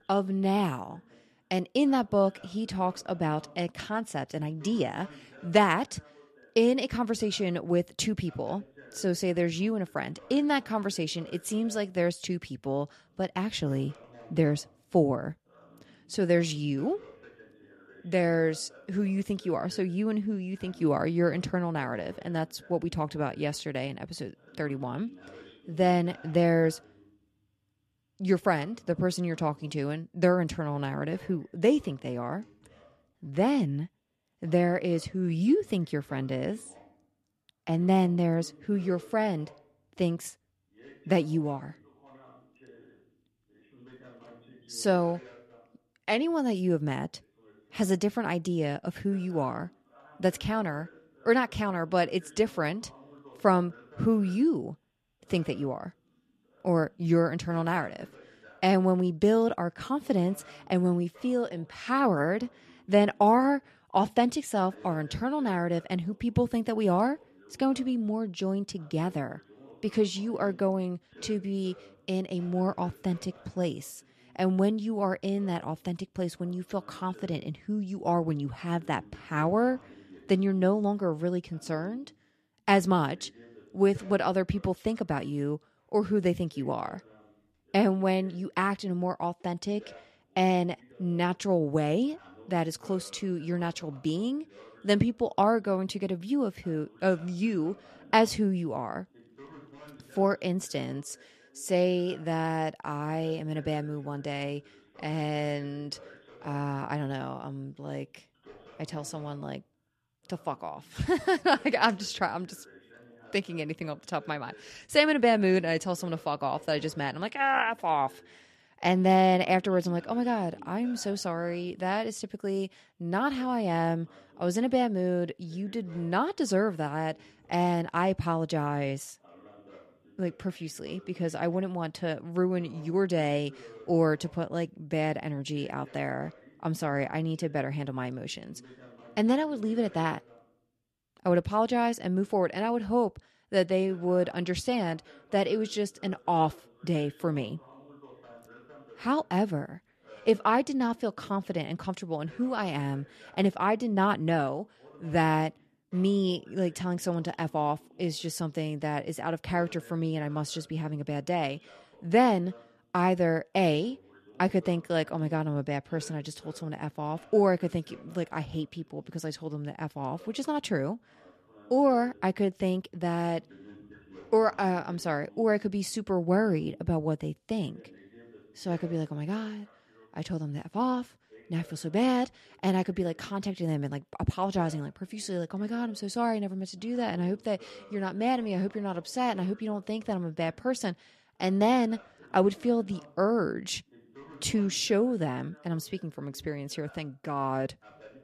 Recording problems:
voice in the background; faint; throughout; 25 dB below the speech

